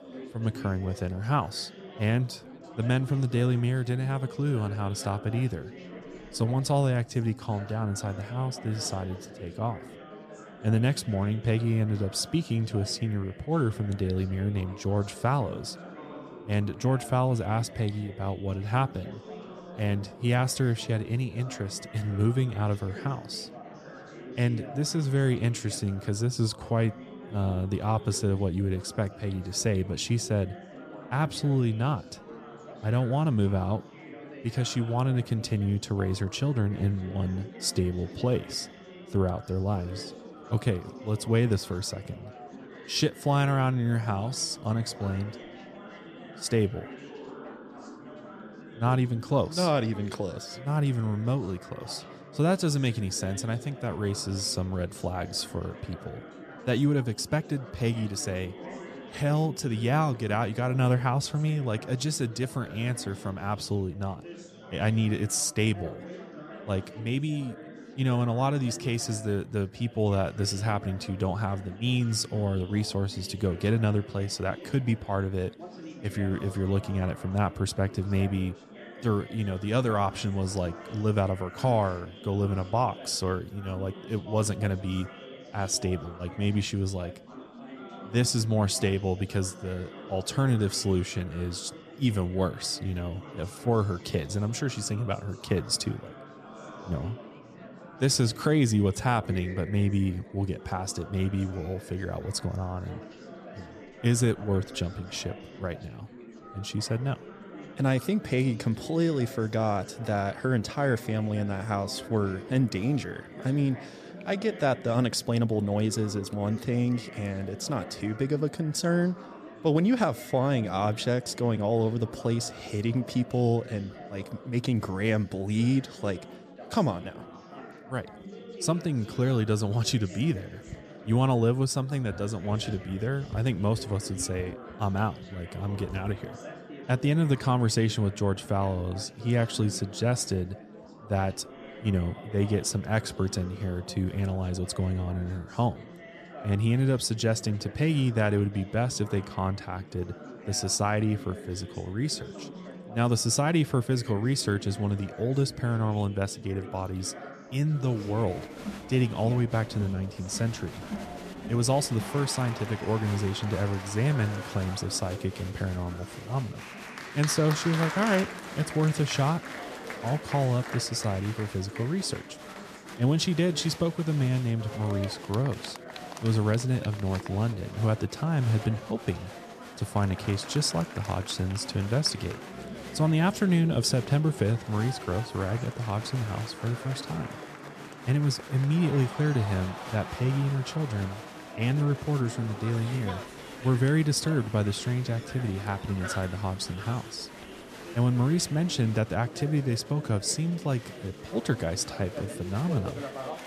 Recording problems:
chatter from many people; noticeable; throughout; 15 dB below the speech

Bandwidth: 14.5 kHz